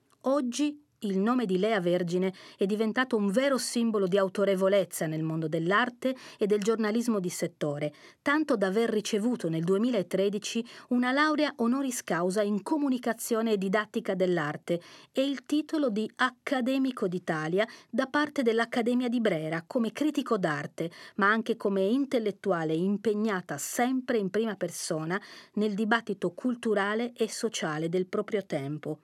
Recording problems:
none

